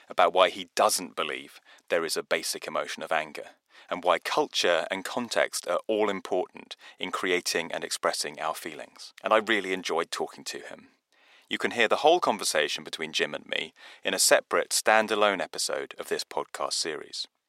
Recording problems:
thin; very; fading below 550 Hz

